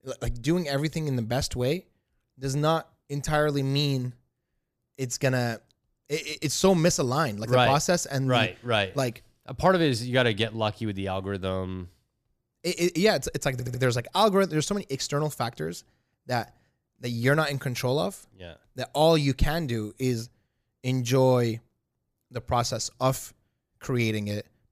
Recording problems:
audio stuttering; at 14 s

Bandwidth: 15 kHz